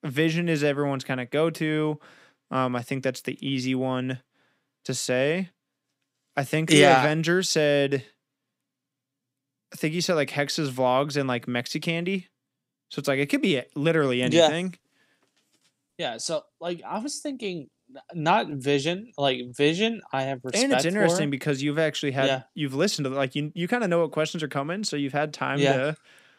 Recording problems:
none

